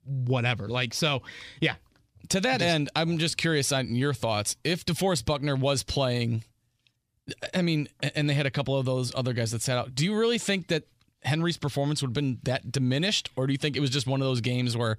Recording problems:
none

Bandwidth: 15 kHz